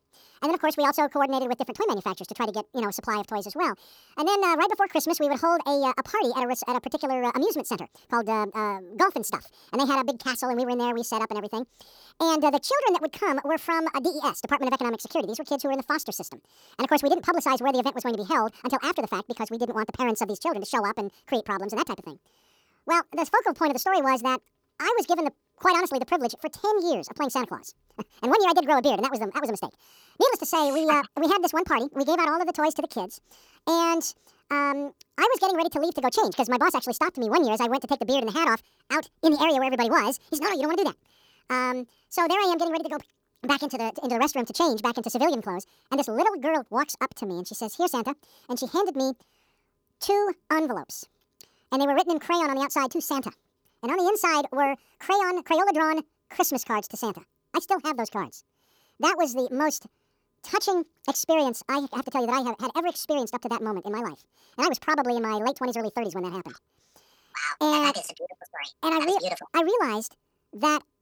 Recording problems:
wrong speed and pitch; too fast and too high; 1.7 times normal speed

